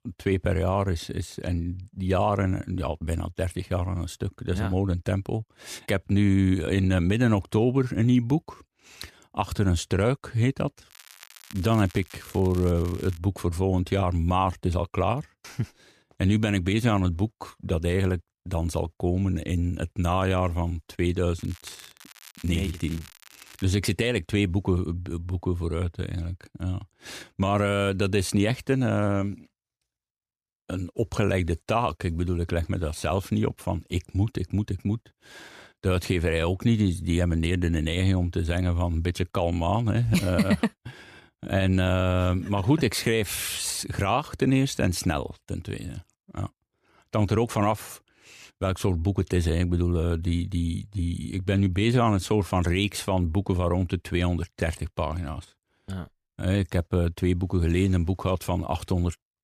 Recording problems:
crackling; faint; from 11 to 13 s and from 21 to 24 s; 20 dB below the speech

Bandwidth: 14.5 kHz